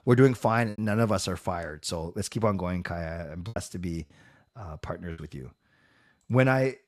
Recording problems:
choppy; very; at 0.5 s, at 3.5 s and at 5 s; 6% of the speech affected

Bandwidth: 13.5 kHz